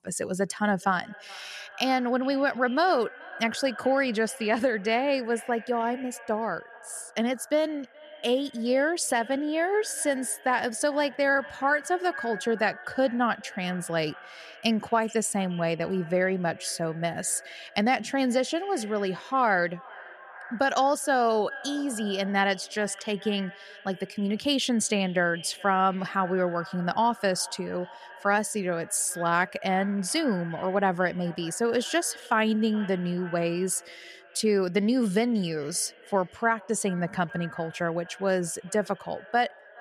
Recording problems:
echo of what is said; noticeable; throughout; 430 ms later, 20 dB below the speech

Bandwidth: 13.5 kHz